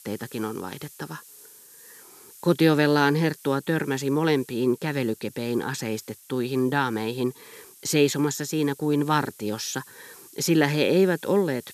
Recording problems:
hiss; faint; throughout; 20 dB below the speech

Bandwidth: 14 kHz